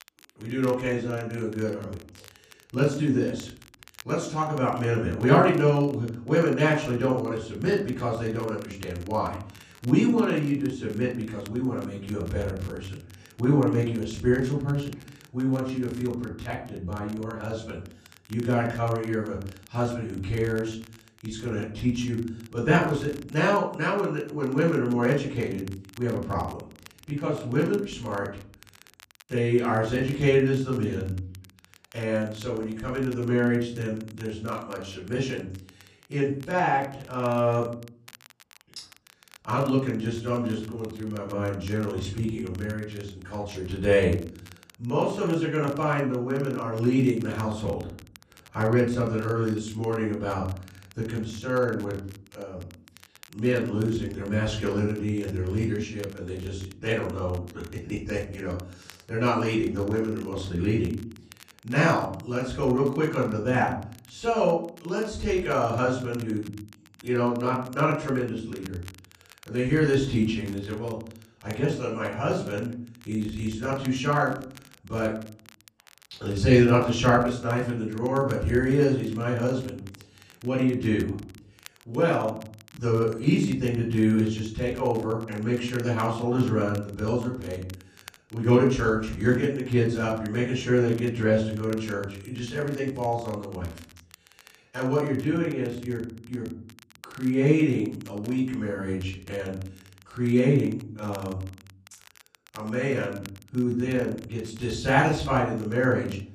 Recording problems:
off-mic speech; far
room echo; noticeable; dies away in 0.6 s
crackle, like an old record; faint; 25 dB below the speech

